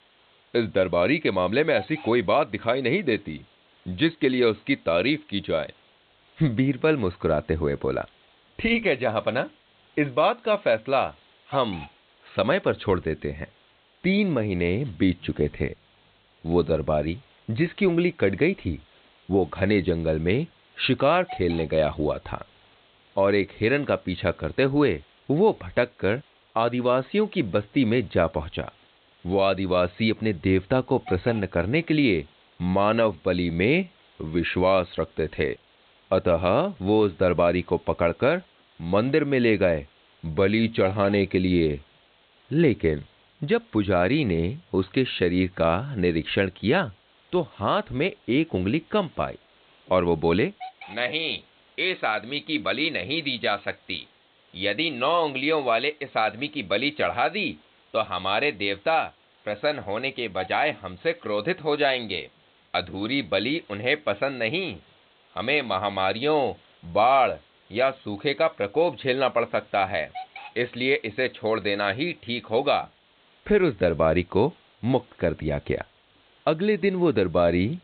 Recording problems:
high frequencies cut off; severe; nothing above 4 kHz
hiss; faint; throughout; 25 dB below the speech

